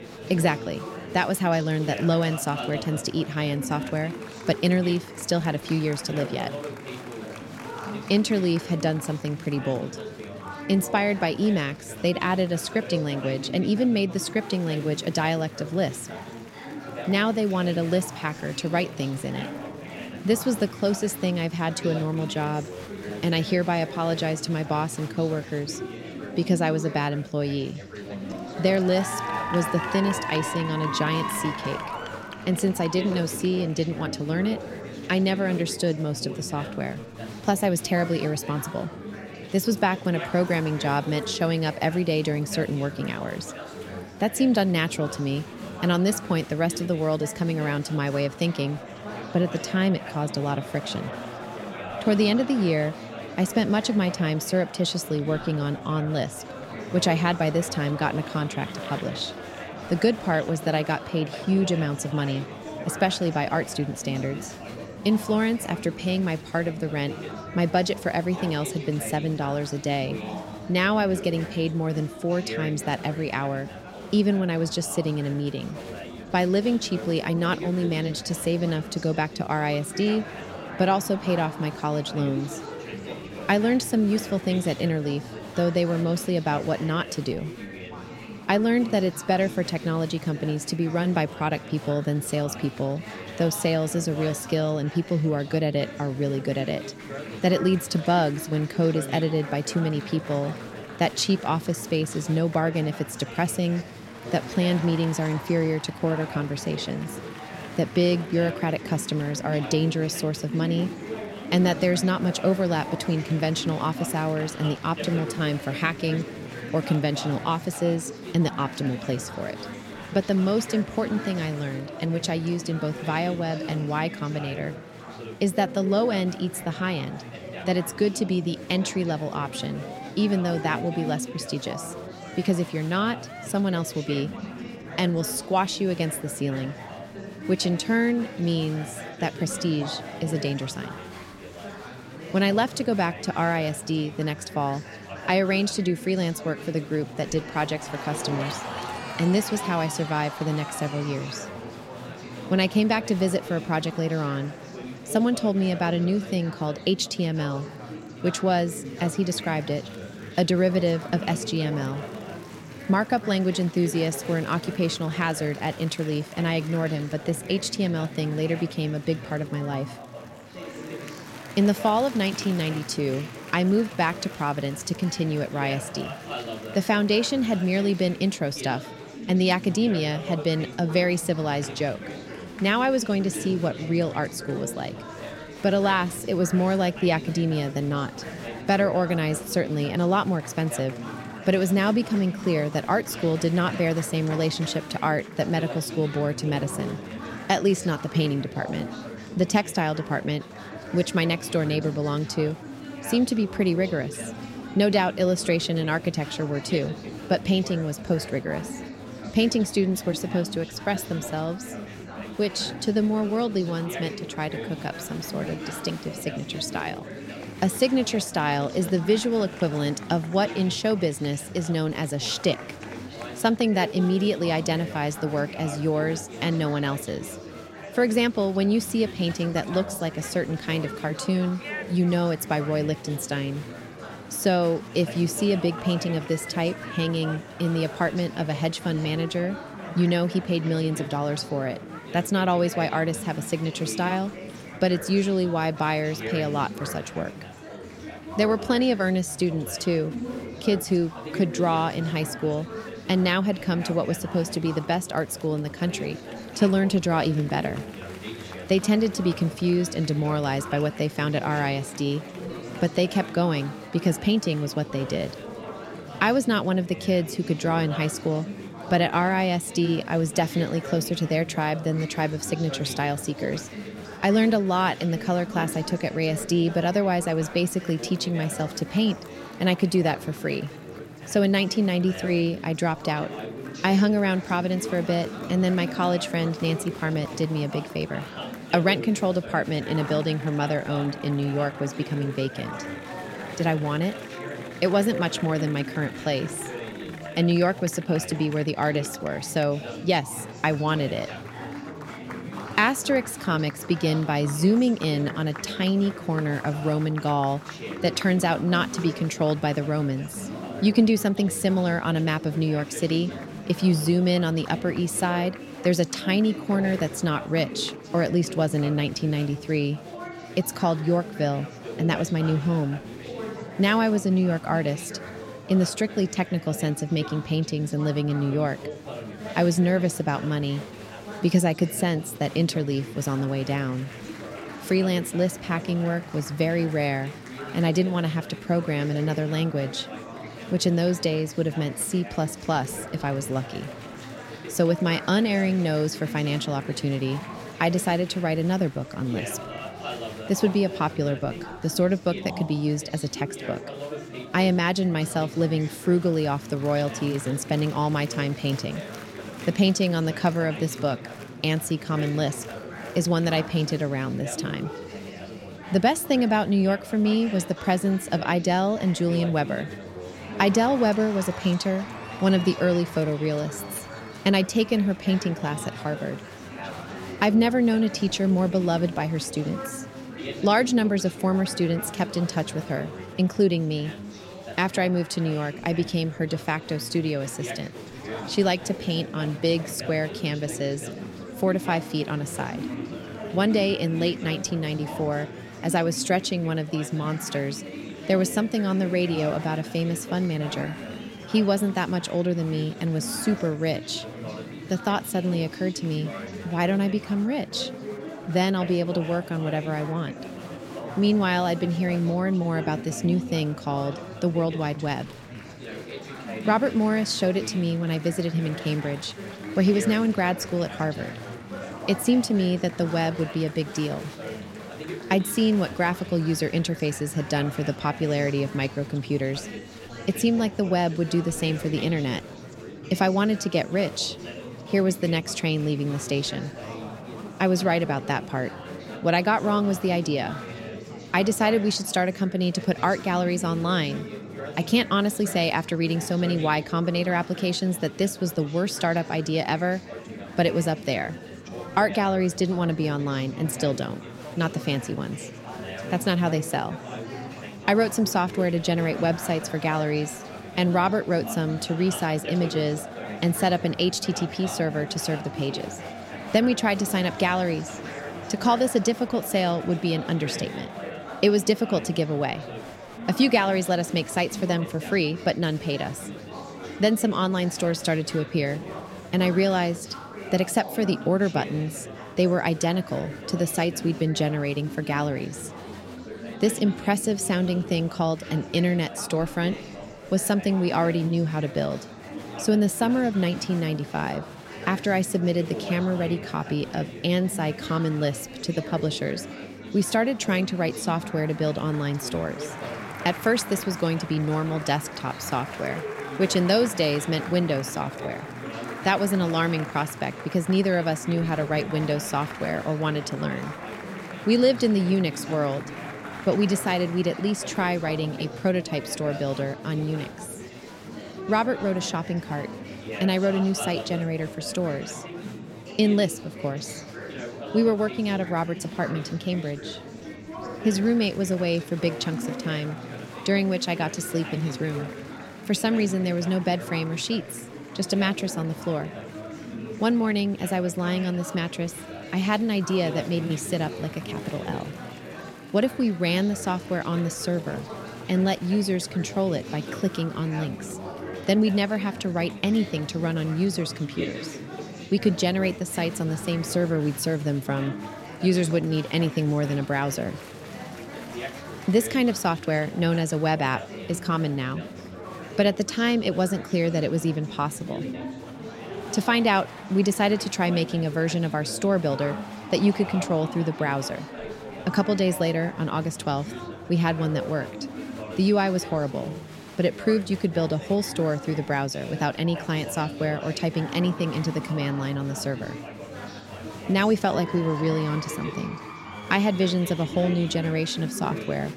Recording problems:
chatter from many people; noticeable; throughout; 10 dB below the speech

